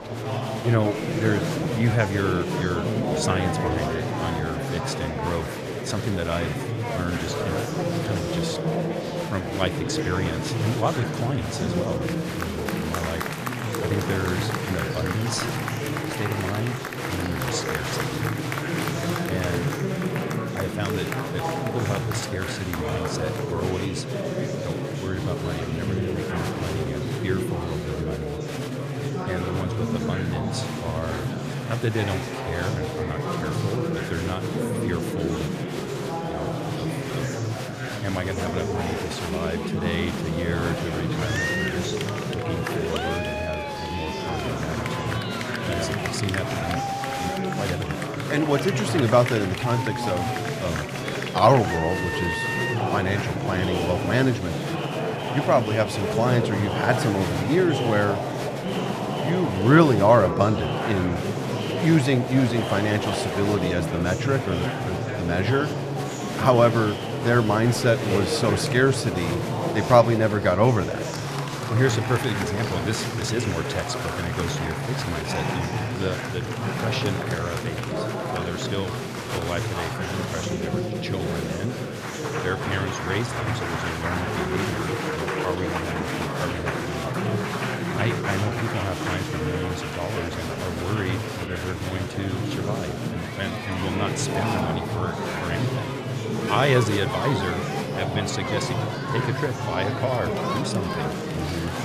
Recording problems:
murmuring crowd; loud; throughout; 1 dB below the speech

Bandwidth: 14.5 kHz